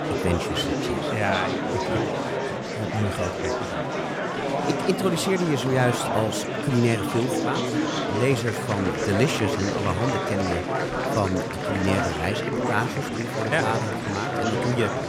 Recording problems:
murmuring crowd; very loud; throughout; as loud as the speech

